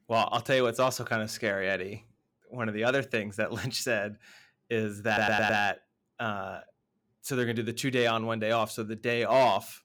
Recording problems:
audio stuttering; at 5 s

